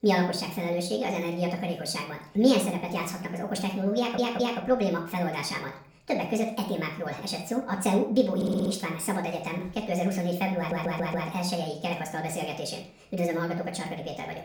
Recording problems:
off-mic speech; far
wrong speed and pitch; too fast and too high; 1.6 times normal speed
room echo; slight; dies away in 0.4 s
audio stuttering; at 4 s, at 8.5 s and at 11 s

